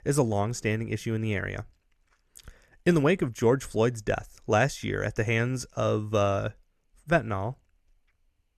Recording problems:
none

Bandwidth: 13.5 kHz